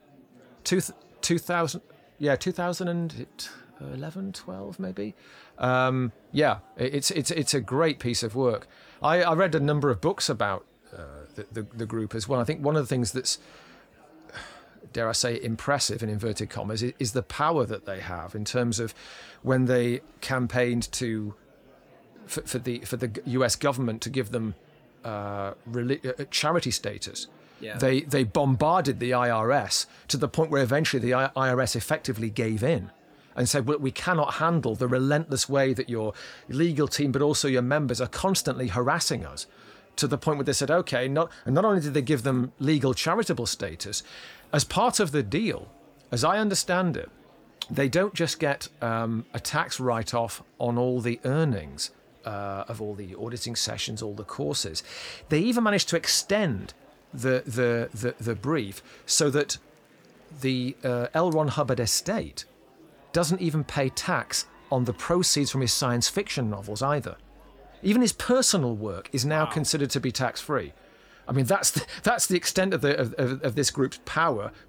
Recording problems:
murmuring crowd; faint; throughout; 30 dB below the speech

